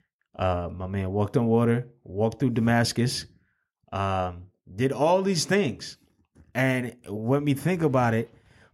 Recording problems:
none

